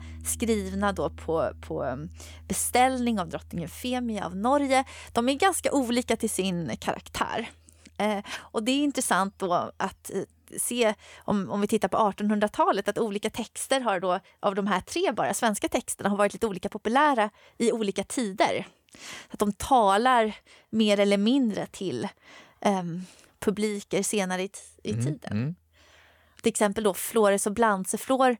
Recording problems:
background music; faint; throughout; 25 dB below the speech

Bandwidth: 18 kHz